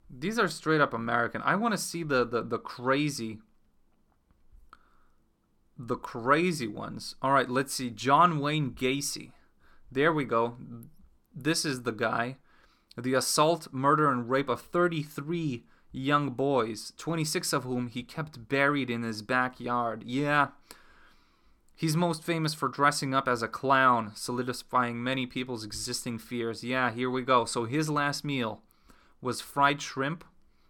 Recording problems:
none

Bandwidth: 18 kHz